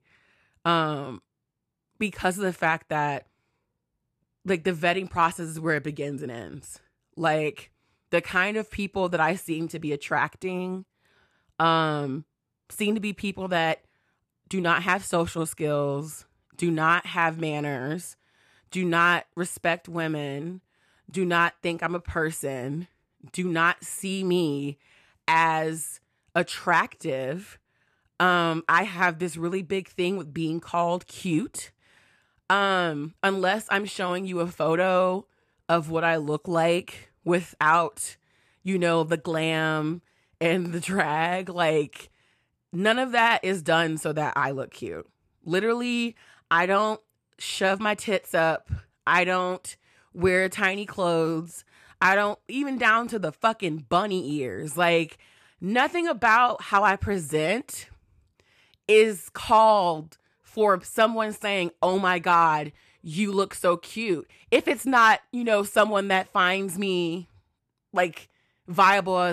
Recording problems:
abrupt cut into speech; at the end

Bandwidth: 14 kHz